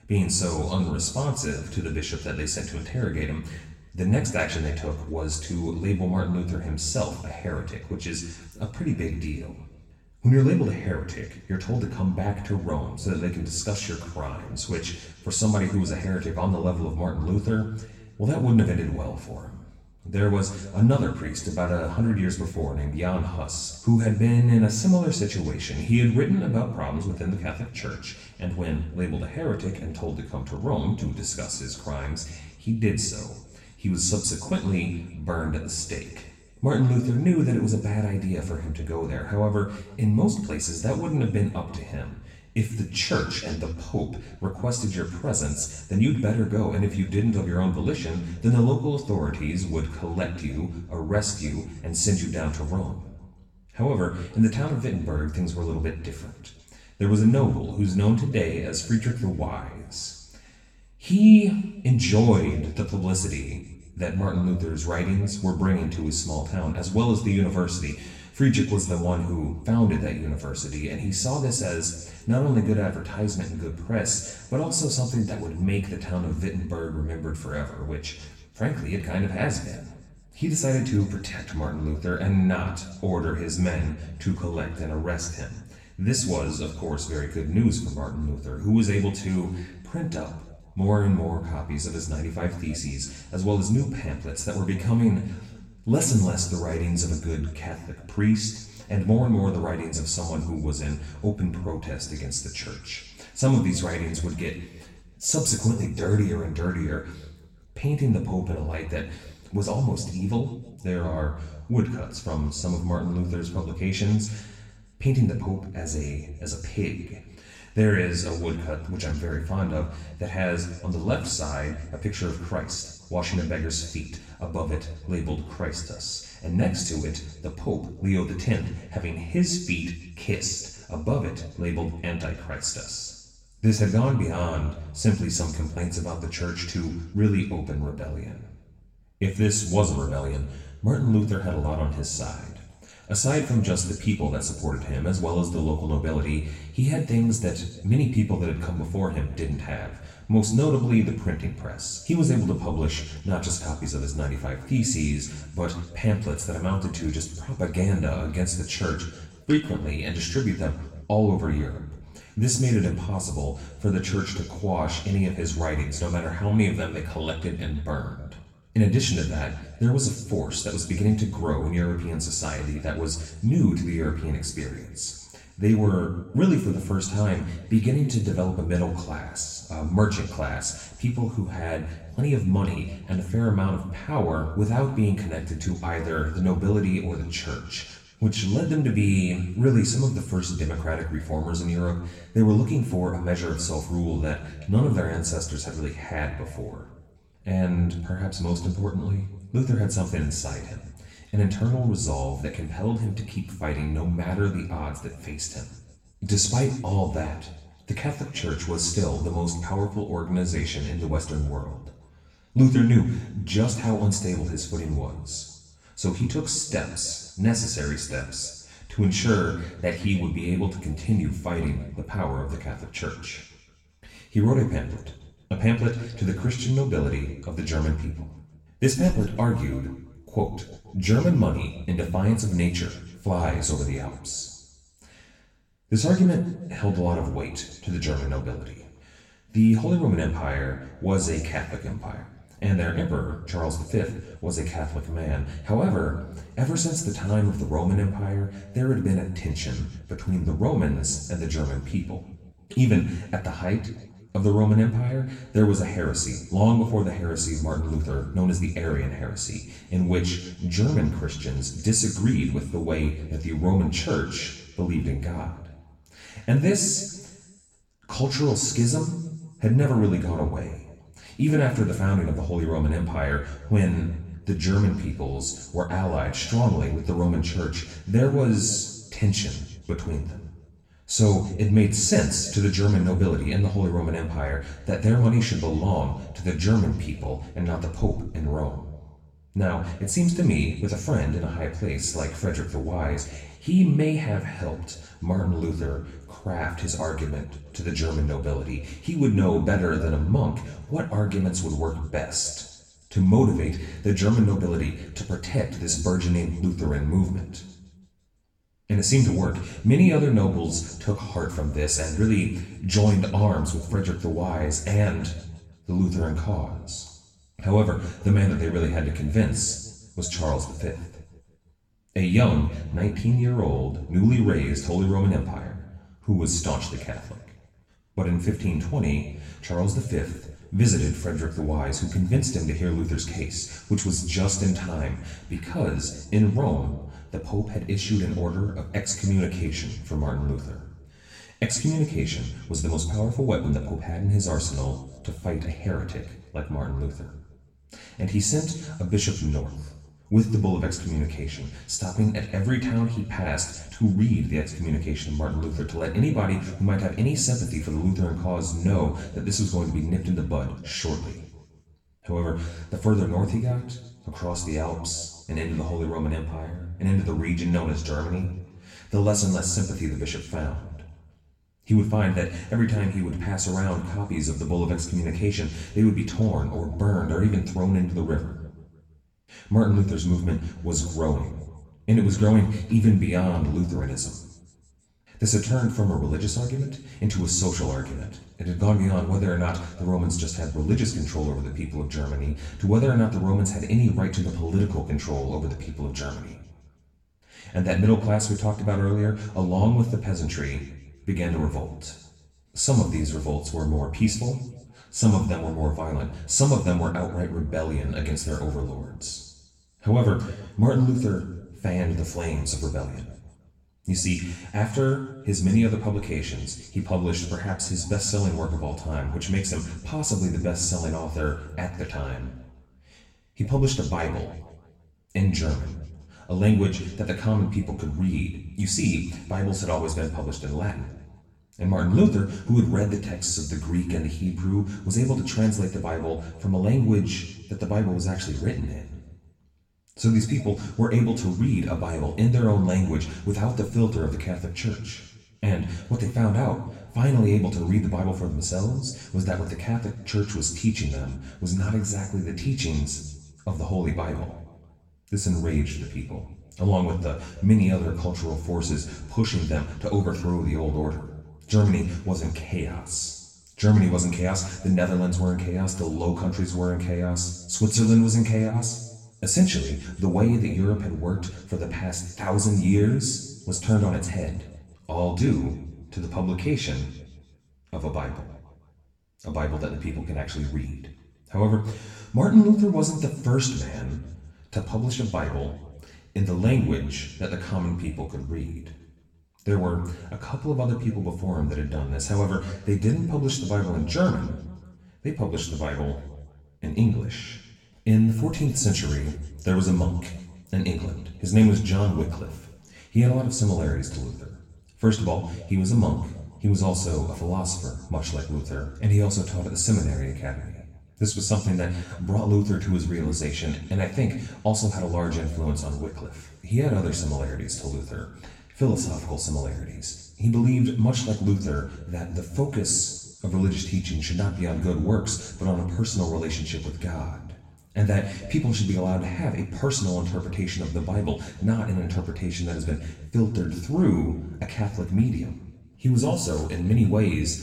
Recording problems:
off-mic speech; far
room echo; slight; dies away in 1 s

